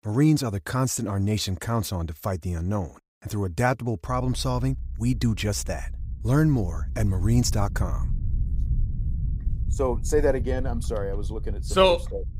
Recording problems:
low rumble; faint; from 4 s on; 20 dB below the speech

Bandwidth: 15.5 kHz